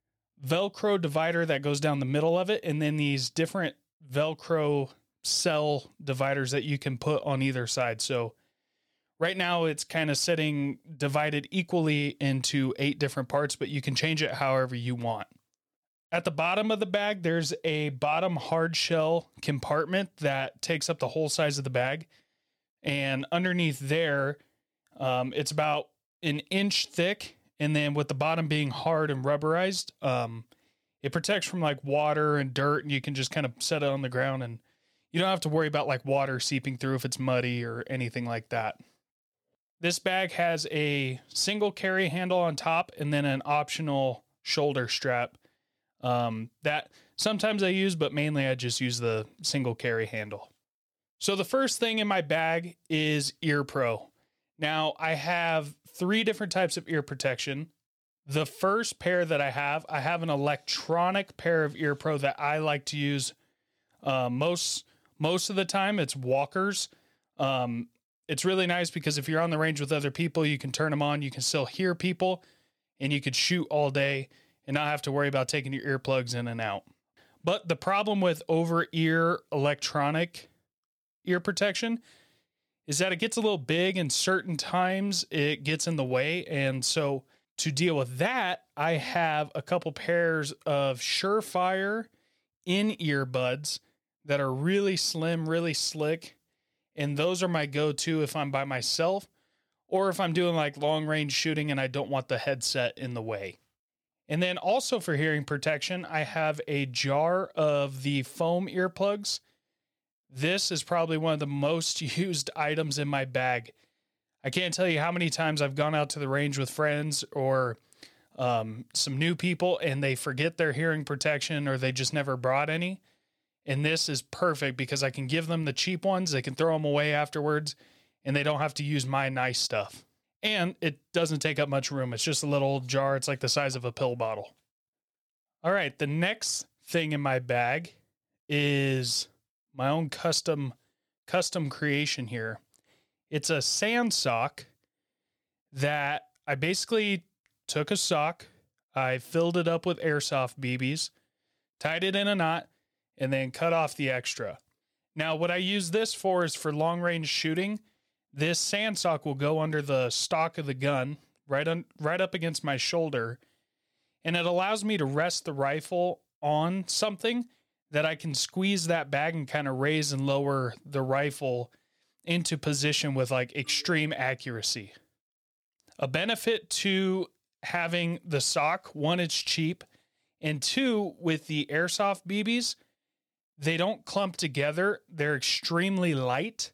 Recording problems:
none

